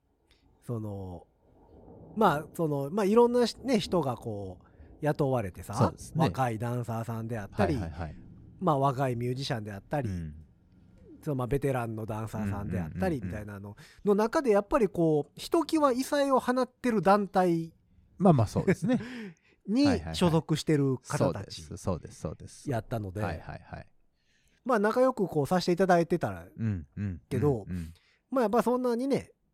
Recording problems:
rain or running water; faint; throughout; 25 dB below the speech

